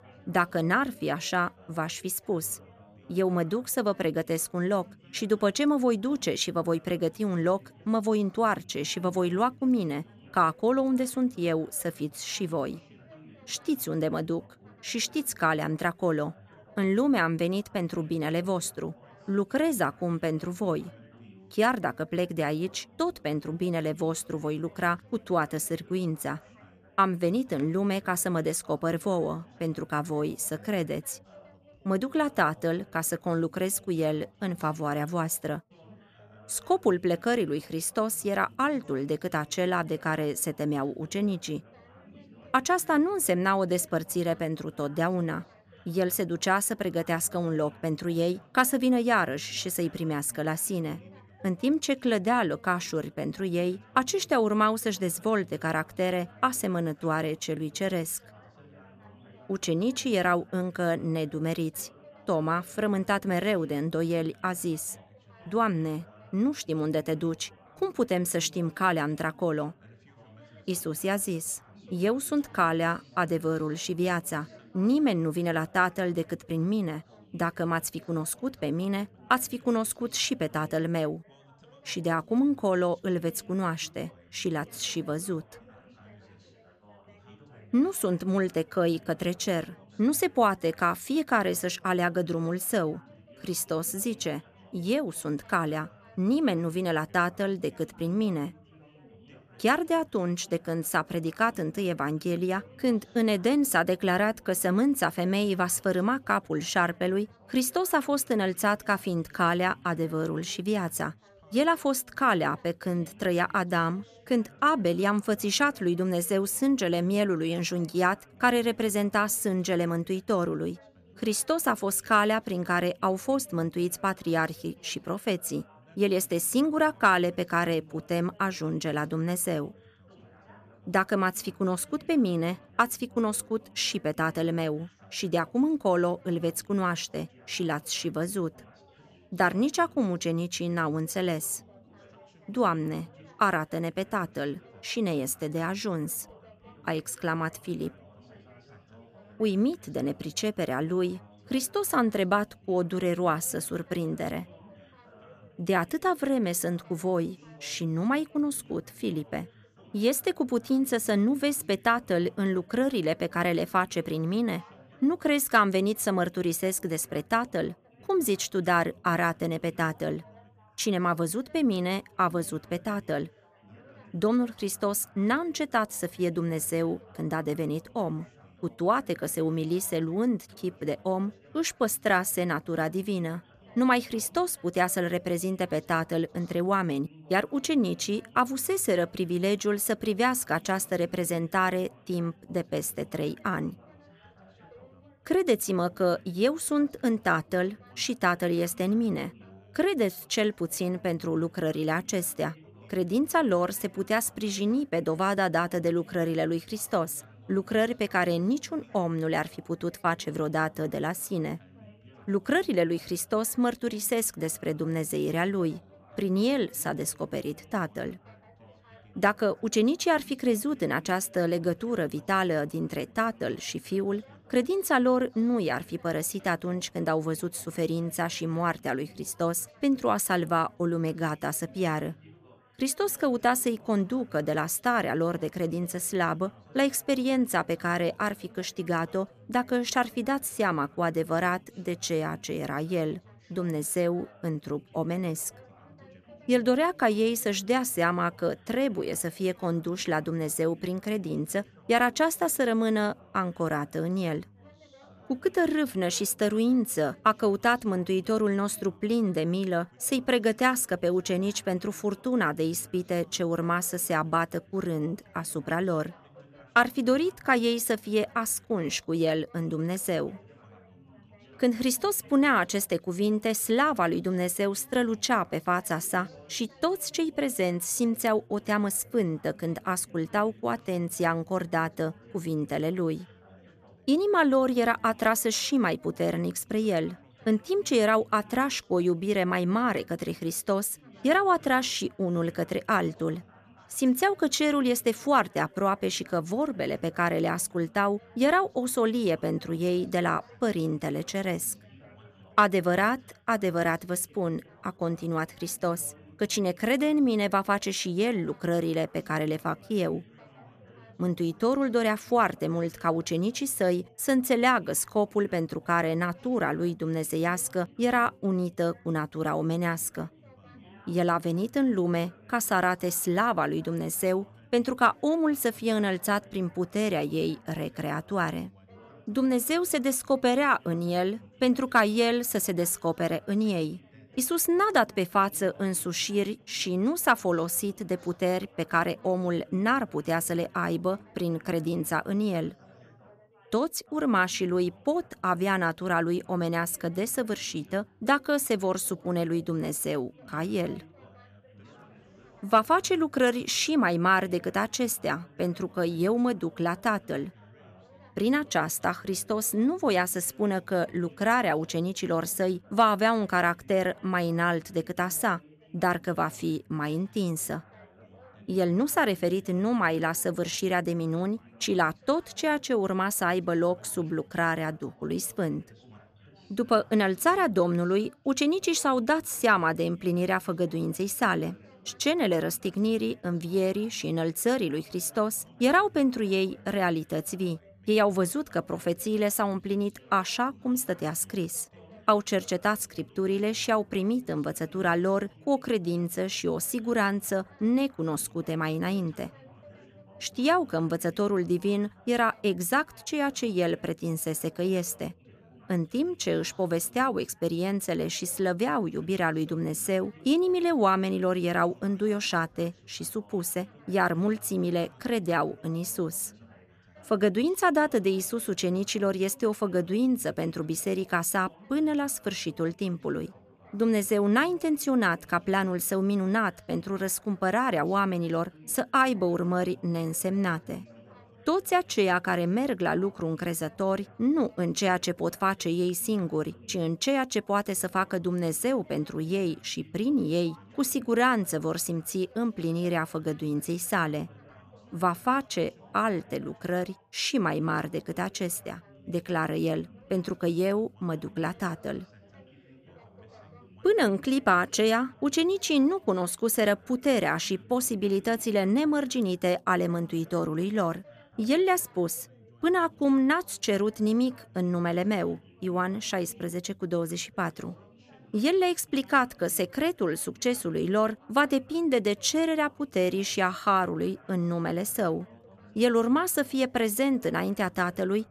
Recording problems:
background chatter; faint; throughout; 4 voices, 25 dB below the speech

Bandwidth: 14.5 kHz